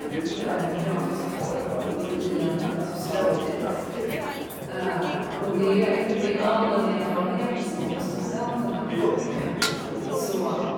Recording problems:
room echo; strong; dies away in 2.6 s
off-mic speech; far
chatter from many people; loud; throughout; 2 dB below the speech
background music; noticeable; throughout; 10 dB below the speech
clattering dishes; faint; at 4 s; peak 15 dB below the speech
clattering dishes; loud; at 9.5 s; peak 2 dB above the speech

